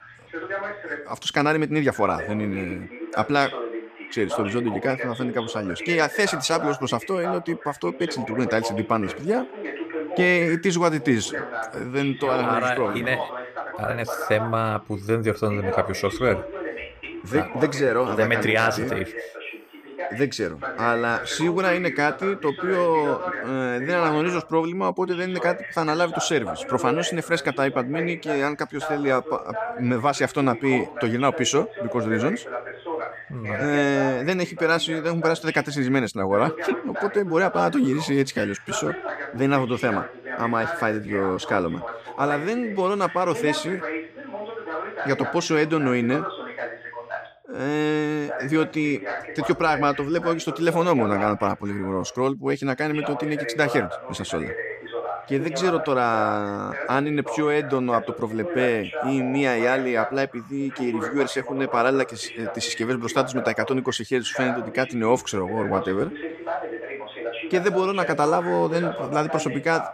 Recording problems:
voice in the background; loud; throughout; 8 dB below the speech
uneven, jittery; strongly; from 8 to 49 s

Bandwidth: 14.5 kHz